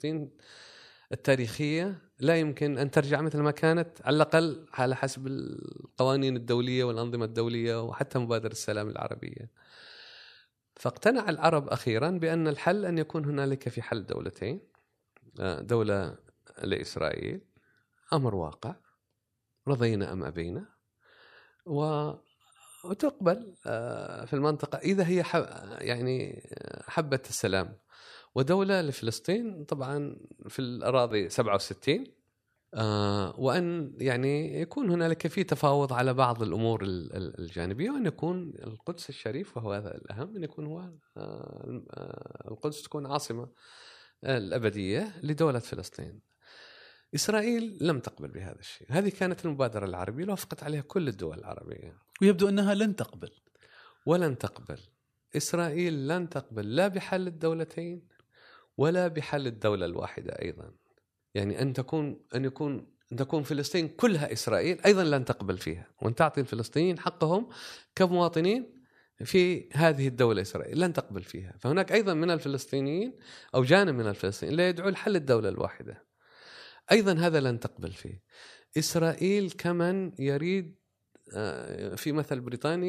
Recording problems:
abrupt cut into speech; at the end

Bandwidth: 14.5 kHz